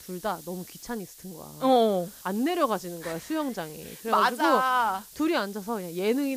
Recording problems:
hiss; noticeable; throughout; 20 dB below the speech
abrupt cut into speech; at the end

